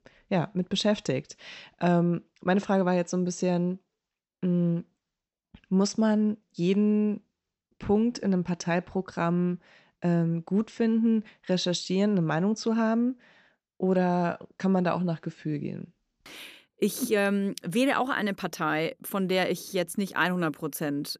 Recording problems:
none

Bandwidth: 14.5 kHz